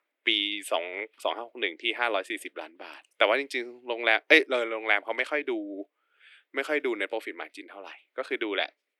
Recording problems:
thin; very; fading below 300 Hz

